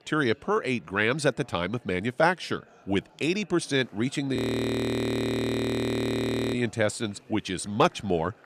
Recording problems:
murmuring crowd; faint; throughout; 30 dB below the speech
audio freezing; at 4.5 s for 2 s

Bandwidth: 14.5 kHz